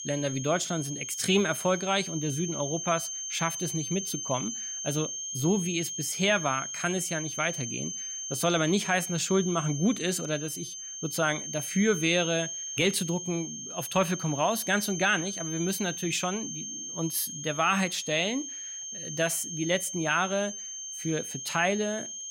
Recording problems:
high-pitched whine; loud; throughout; 6.5 kHz, 6 dB below the speech

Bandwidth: 16 kHz